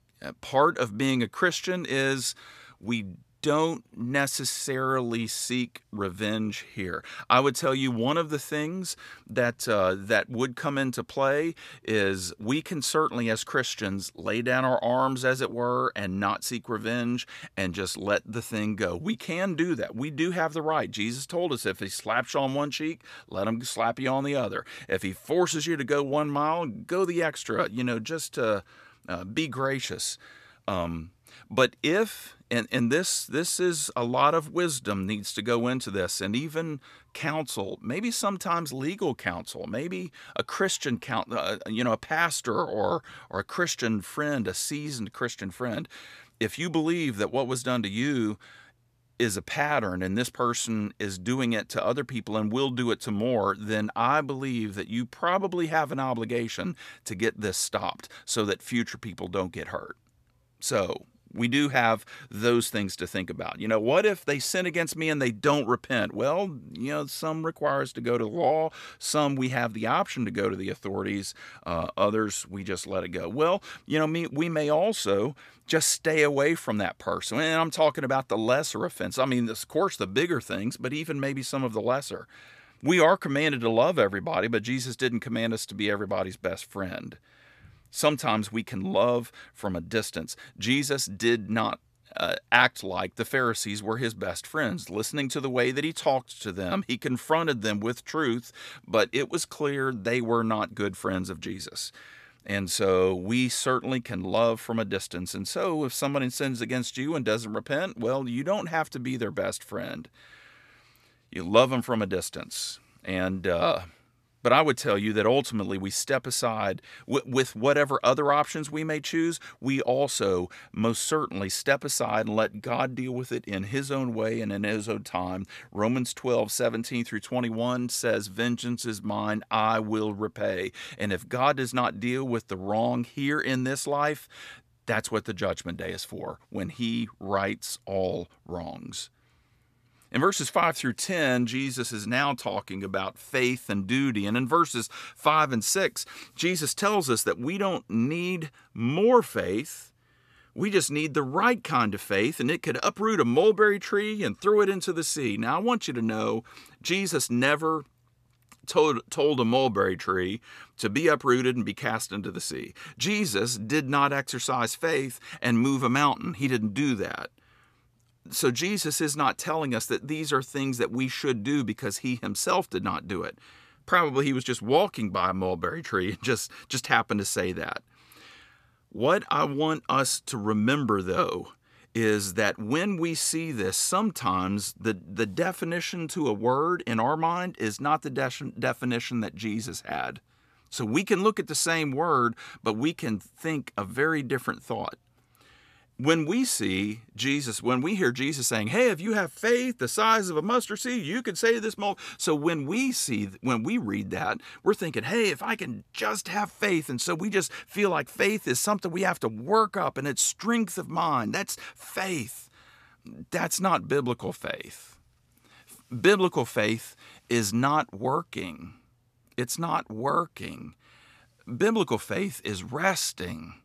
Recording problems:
none

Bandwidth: 14.5 kHz